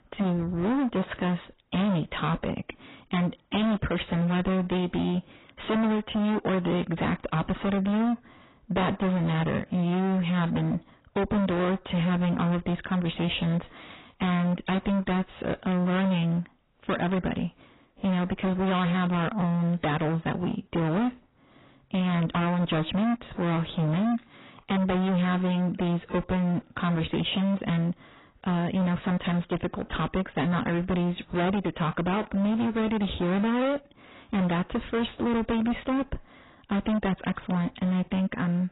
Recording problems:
distortion; heavy; 29% of the sound clipped
garbled, watery; badly; nothing above 4 kHz

